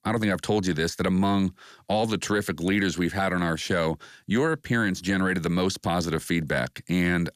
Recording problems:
none

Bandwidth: 14.5 kHz